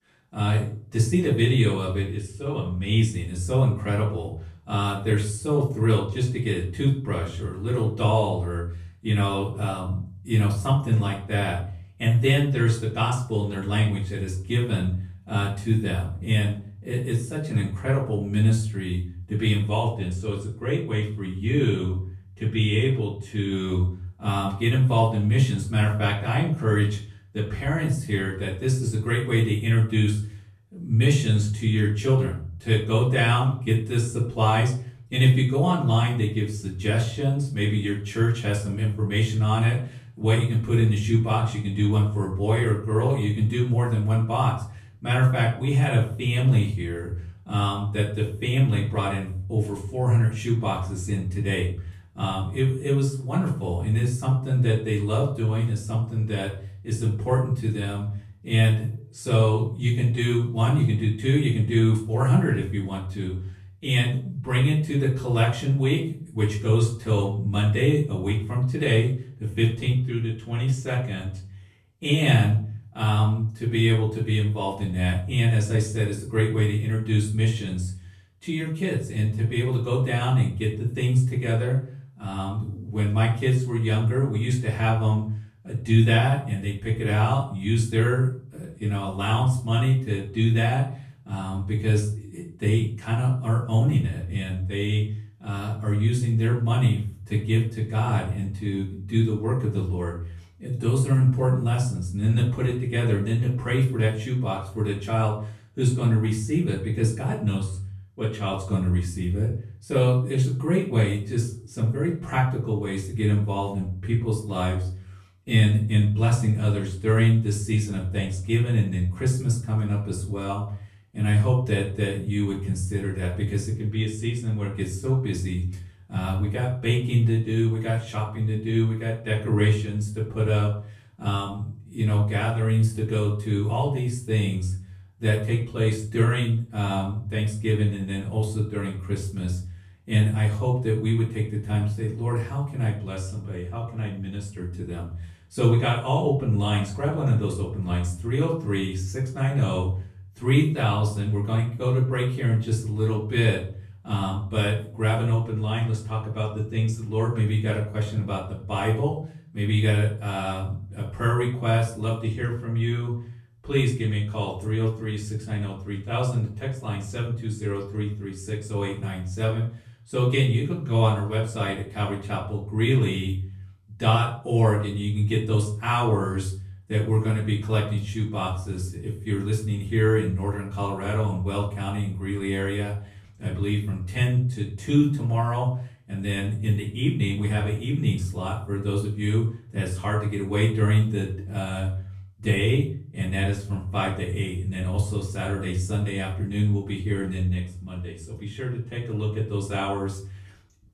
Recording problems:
off-mic speech; far
room echo; slight; dies away in 0.4 s

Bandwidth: 13.5 kHz